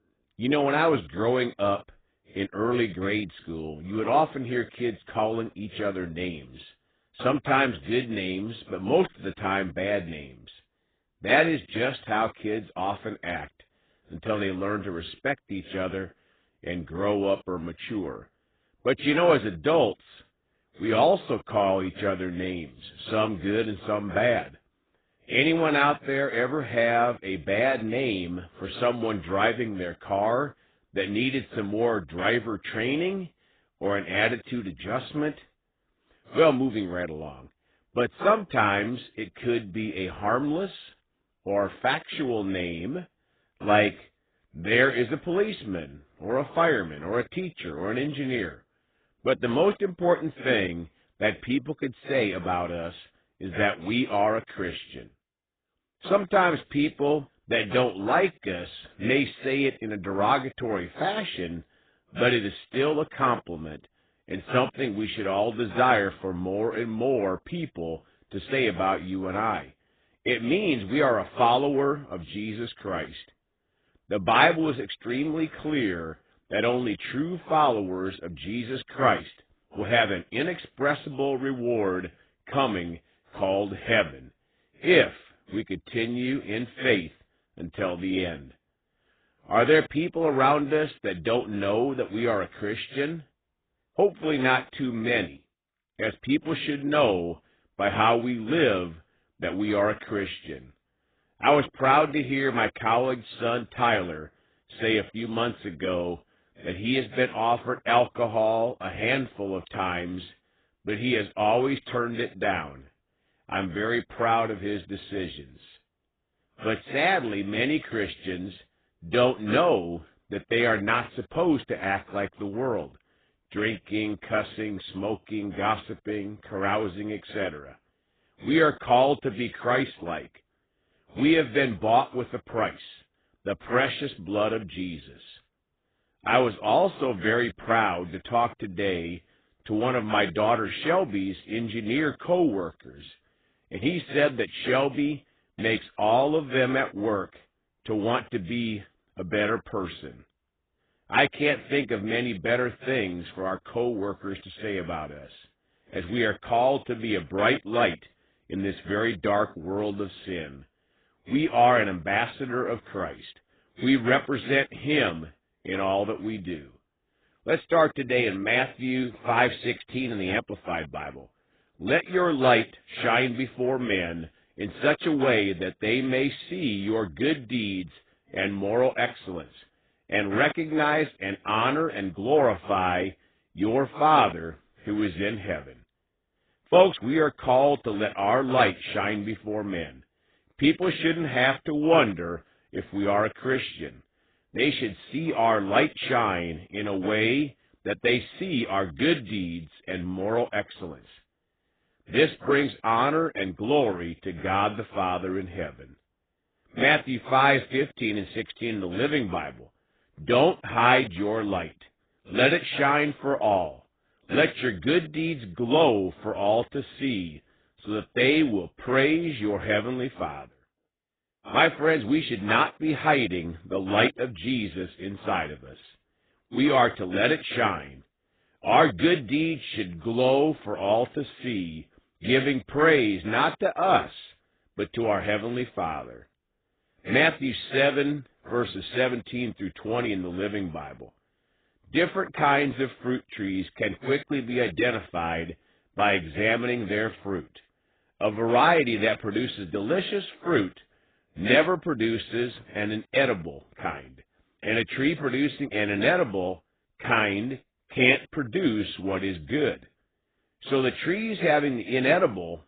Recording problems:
garbled, watery; badly; nothing above 3.5 kHz

